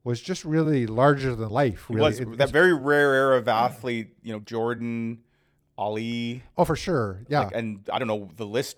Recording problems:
uneven, jittery; strongly; from 0.5 to 8 s

